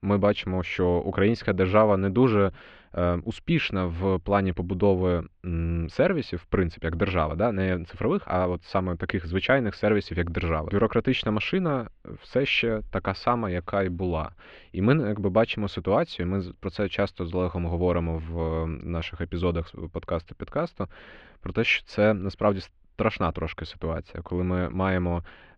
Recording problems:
muffled; very; fading above 3 kHz

